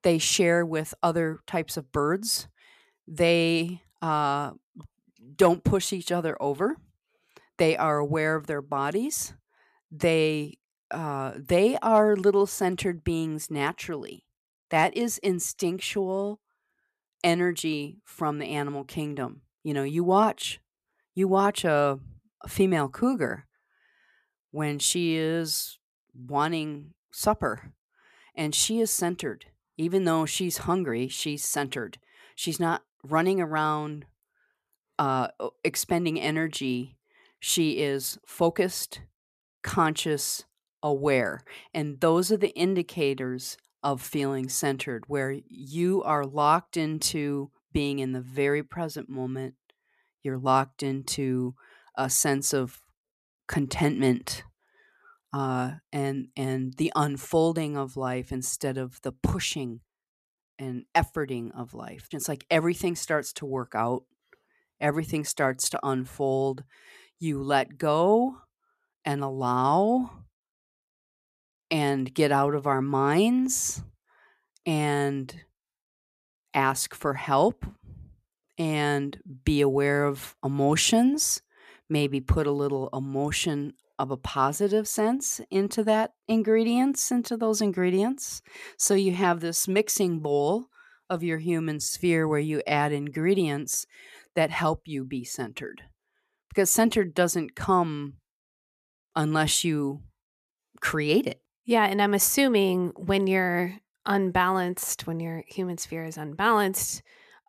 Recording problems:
none

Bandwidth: 14.5 kHz